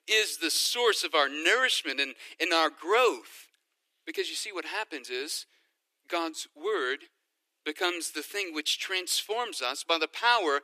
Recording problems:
thin; very; fading below 300 Hz

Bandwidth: 14.5 kHz